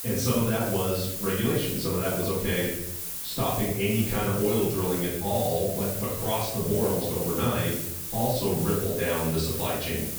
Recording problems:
off-mic speech; far
room echo; noticeable; dies away in 0.7 s
hiss; loud; throughout; 4 dB below the speech

